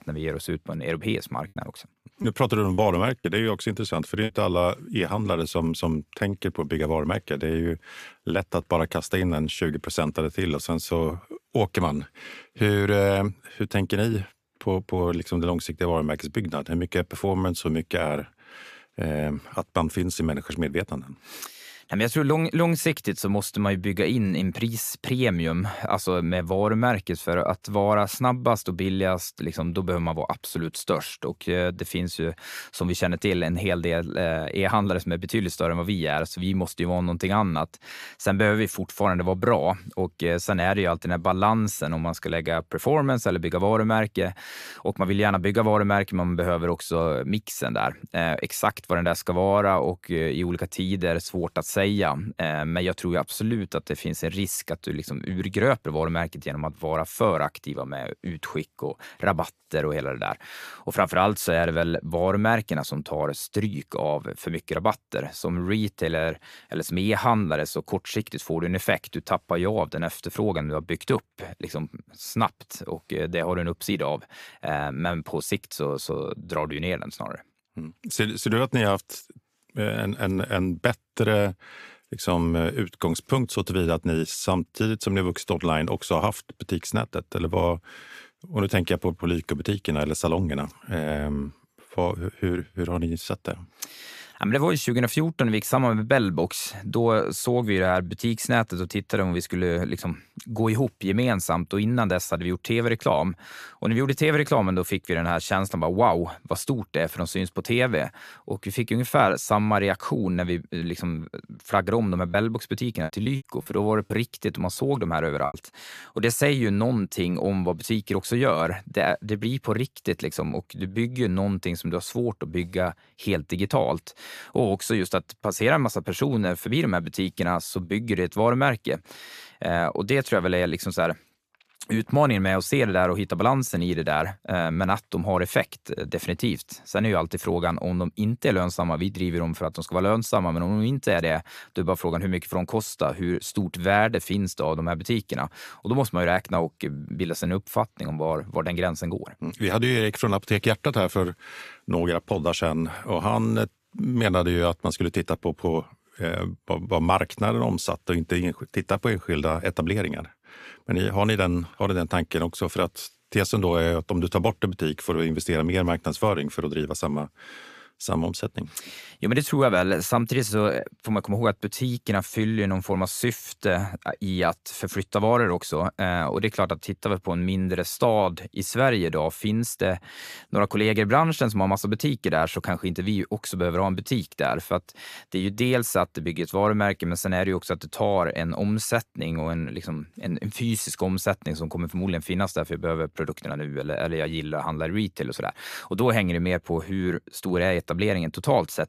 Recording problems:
choppy; very; from 2 to 4.5 s and from 1:52 to 1:56; 7% of the speech affected

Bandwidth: 14.5 kHz